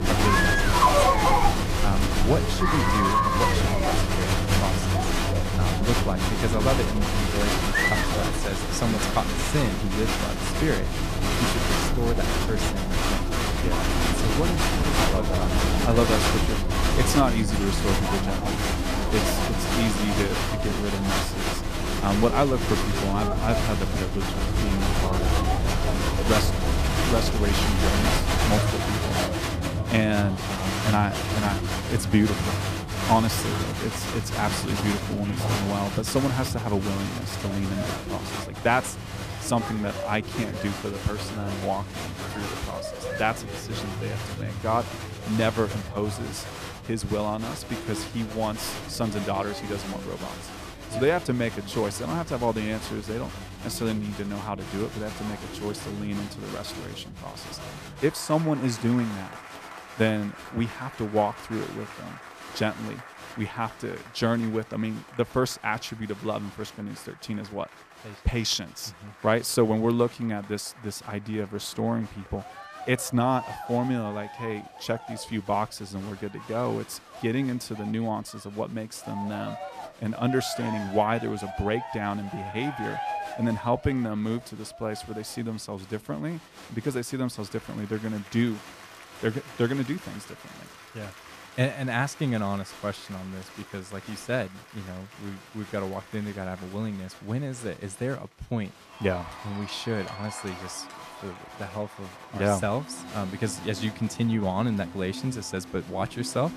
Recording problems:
crowd noise; very loud; throughout; 2 dB above the speech

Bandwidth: 14.5 kHz